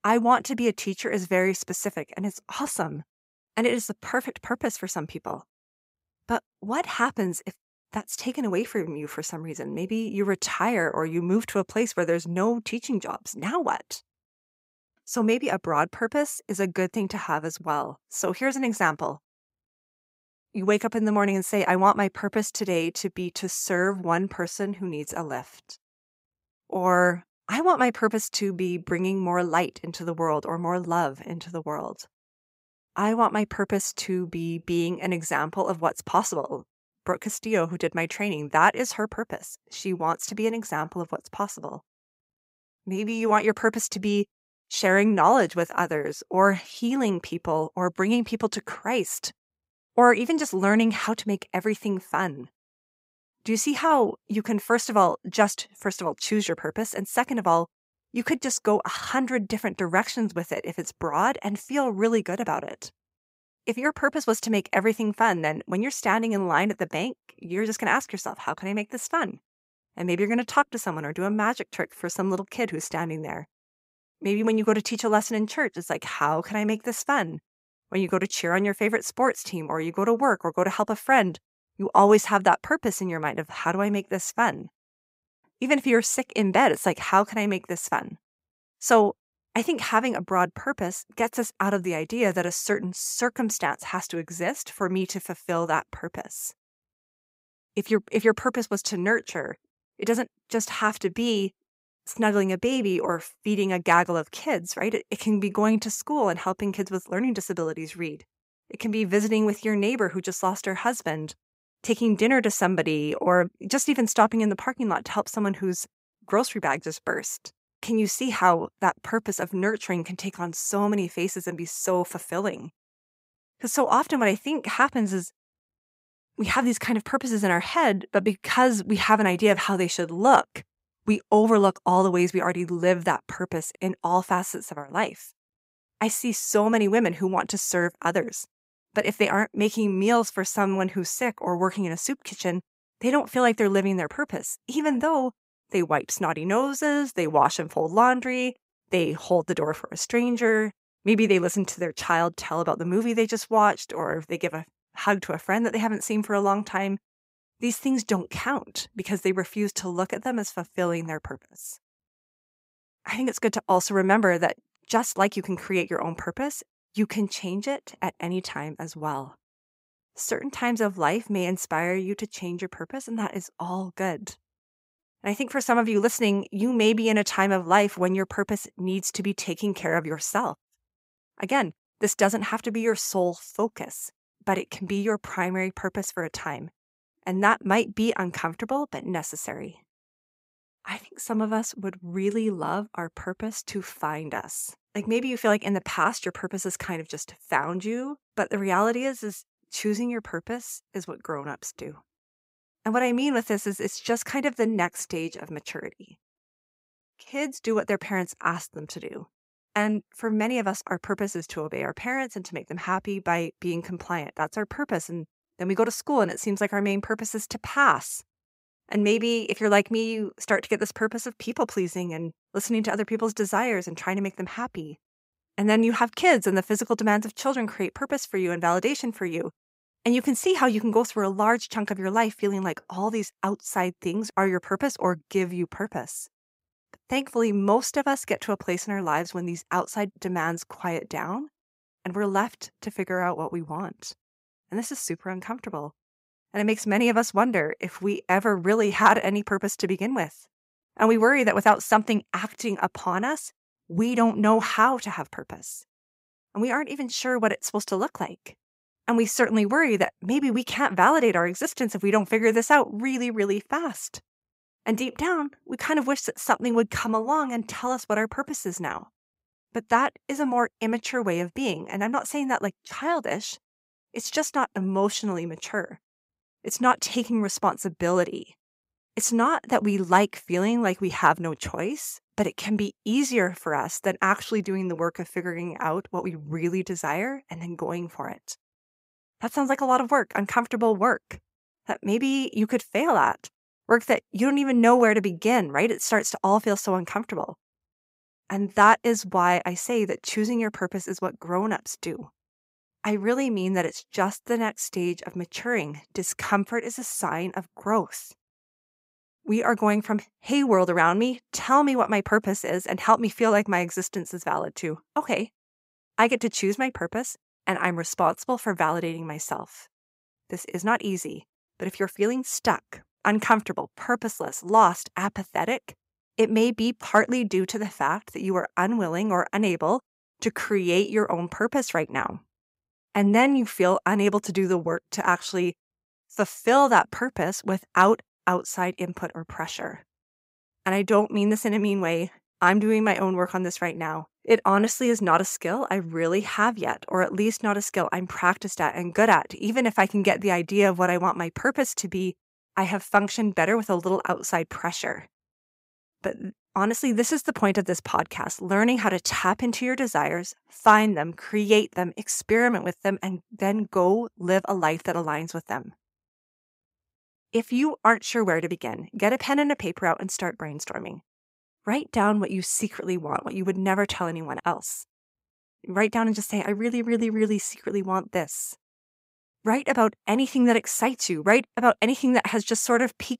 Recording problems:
none

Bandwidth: 15.5 kHz